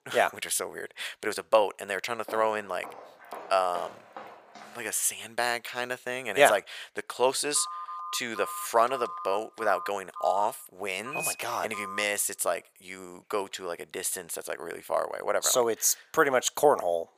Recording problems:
thin; very; fading below 550 Hz
footsteps; faint; from 2.5 to 5 s; peak 15 dB below the speech
phone ringing; noticeable; from 7.5 to 12 s; peak 7 dB below the speech

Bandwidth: 15 kHz